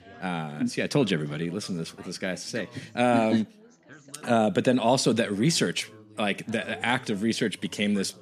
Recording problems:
background chatter; faint; throughout; 4 voices, 25 dB below the speech

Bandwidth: 14.5 kHz